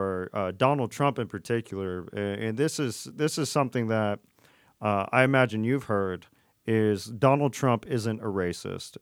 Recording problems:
abrupt cut into speech; at the start

